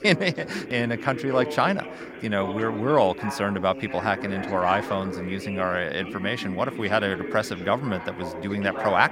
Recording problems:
background chatter; loud; throughout; 3 voices, 9 dB below the speech

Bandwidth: 16 kHz